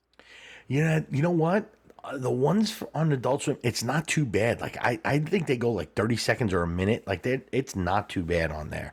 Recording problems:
none

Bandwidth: 18.5 kHz